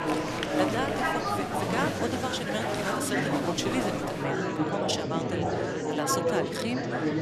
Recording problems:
murmuring crowd; very loud; throughout; 4 dB above the speech

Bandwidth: 13.5 kHz